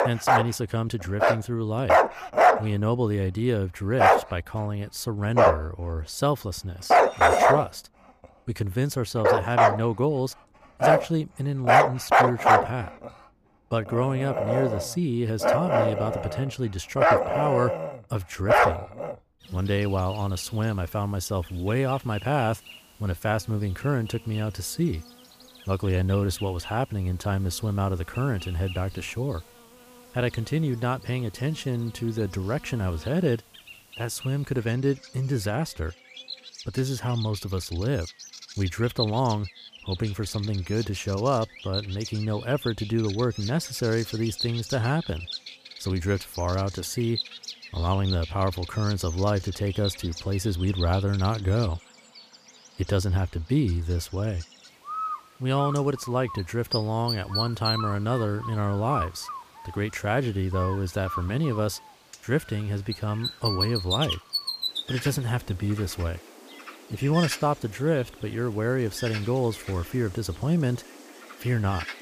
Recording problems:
animal sounds; very loud; throughout; 2 dB above the speech
clattering dishes; noticeable; at 7 s; peak 8 dB below the speech

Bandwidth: 15 kHz